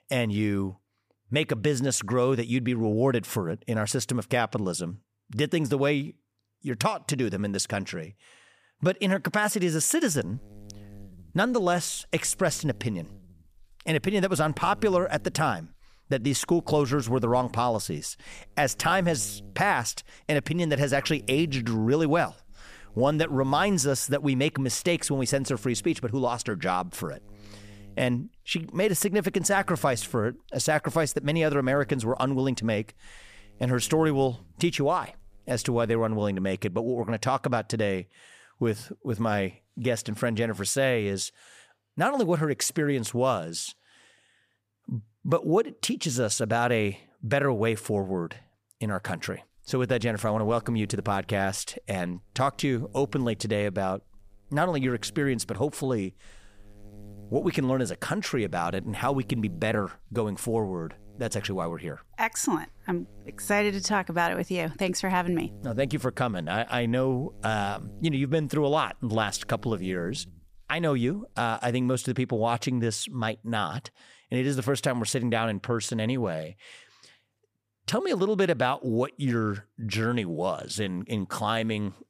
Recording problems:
electrical hum; faint; from 10 to 36 s and from 49 s to 1:11; 50 Hz, 30 dB below the speech

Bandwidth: 15 kHz